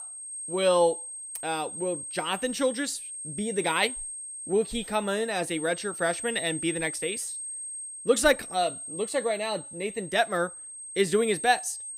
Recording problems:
high-pitched whine; loud; throughout; 8.5 kHz, 8 dB below the speech

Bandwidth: 15.5 kHz